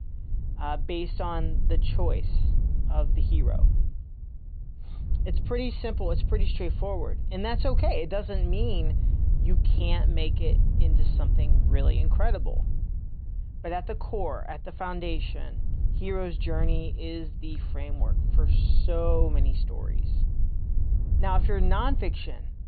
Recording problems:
high frequencies cut off; severe; nothing above 4.5 kHz
wind noise on the microphone; occasional gusts; 10 dB below the speech

